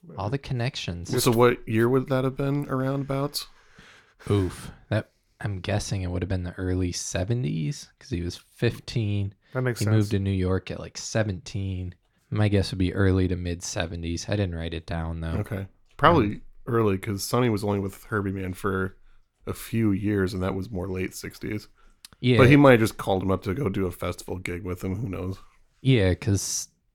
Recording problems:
none

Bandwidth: 18.5 kHz